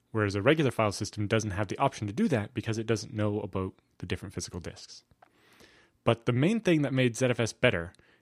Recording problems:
none

